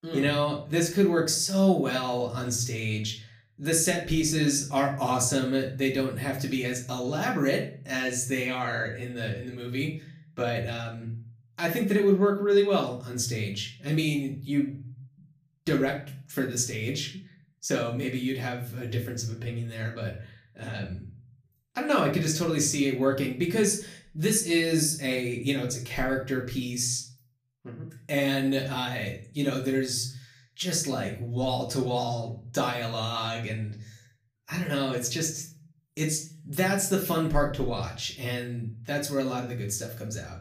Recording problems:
off-mic speech; far
room echo; slight; dies away in 0.4 s

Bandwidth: 15 kHz